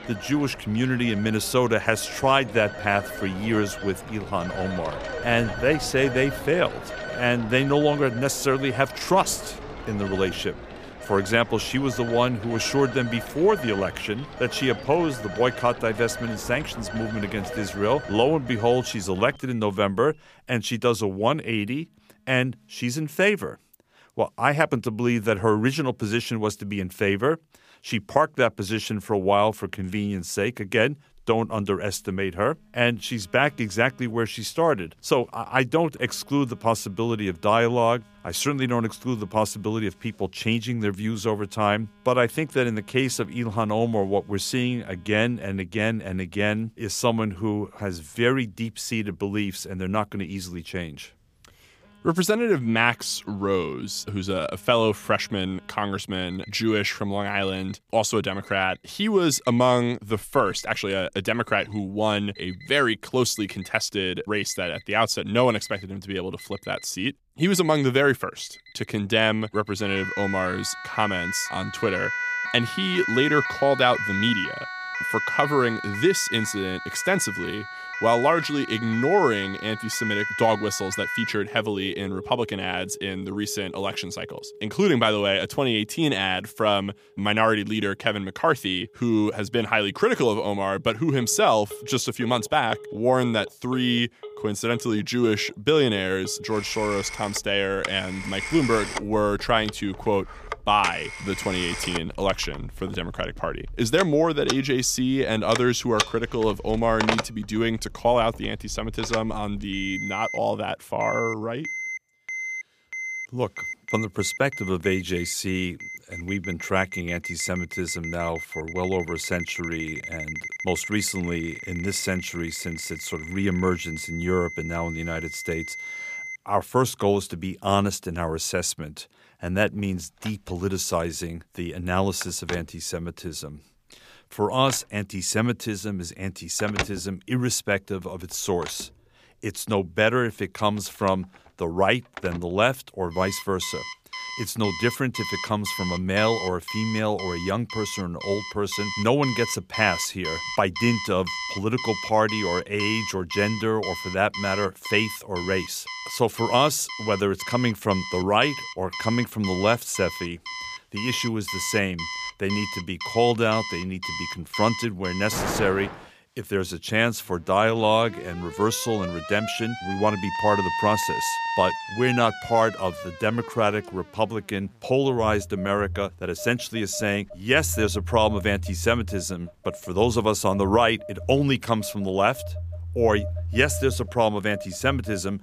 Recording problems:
alarms or sirens; loud; throughout; 8 dB below the speech

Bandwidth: 15 kHz